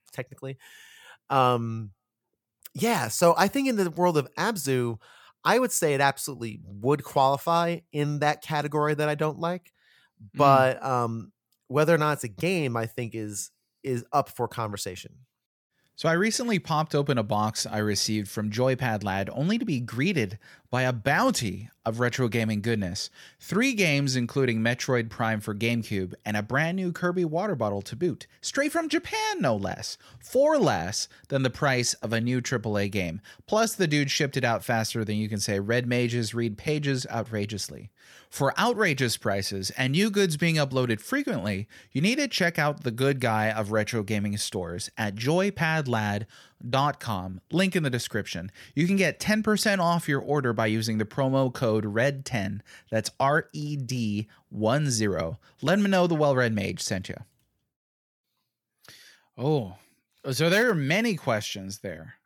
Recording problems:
none

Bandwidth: 18.5 kHz